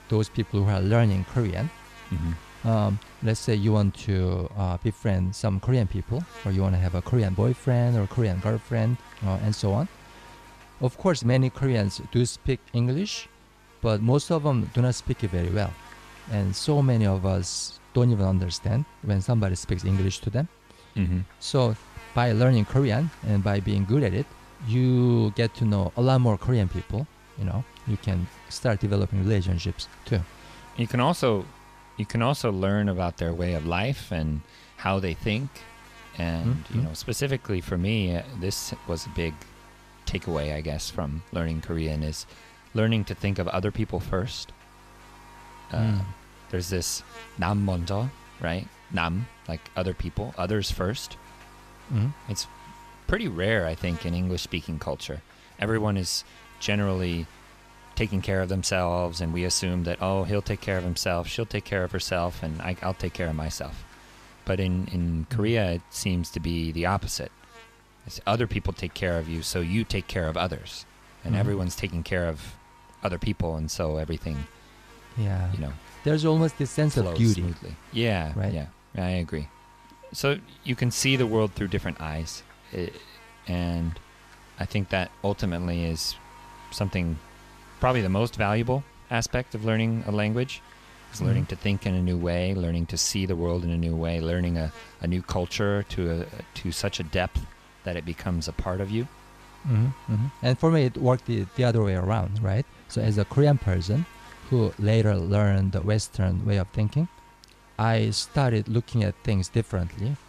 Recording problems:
electrical hum; noticeable; throughout; 50 Hz, 20 dB below the speech

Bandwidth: 14.5 kHz